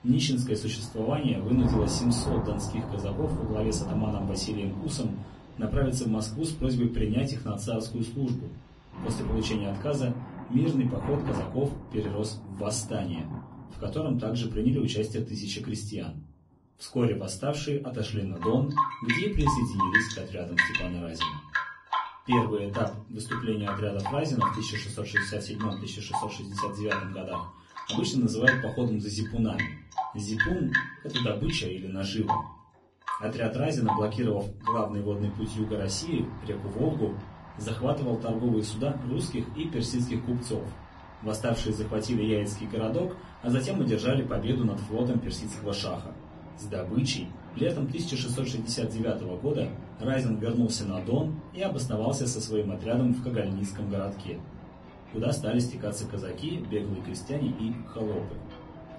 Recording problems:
off-mic speech; far
garbled, watery; badly; nothing above 10.5 kHz
room echo; very slight; dies away in 0.3 s
rain or running water; loud; throughout; 4 dB below the speech

